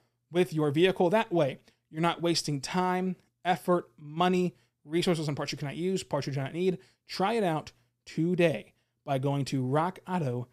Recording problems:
none

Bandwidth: 14.5 kHz